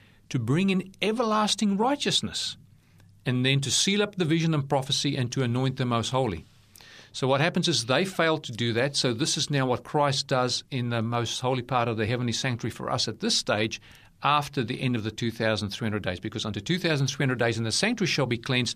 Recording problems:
none

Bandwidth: 14.5 kHz